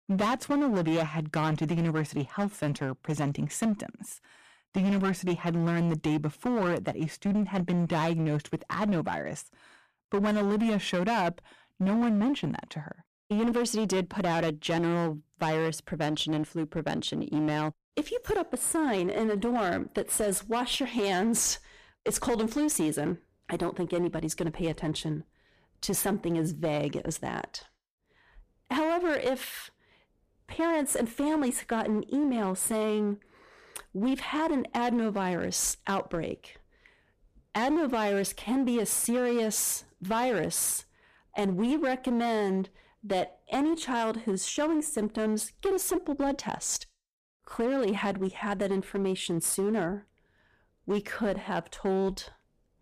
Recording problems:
distortion; slight; 12% of the sound clipped

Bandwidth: 14.5 kHz